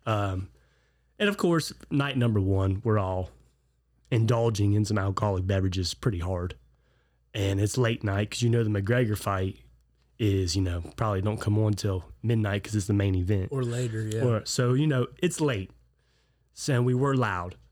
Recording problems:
none

